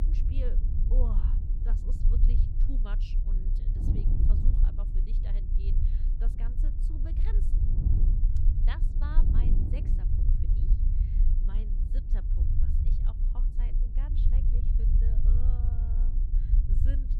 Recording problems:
wind noise on the microphone; heavy; 3 dB below the speech
low rumble; loud; throughout; as loud as the speech

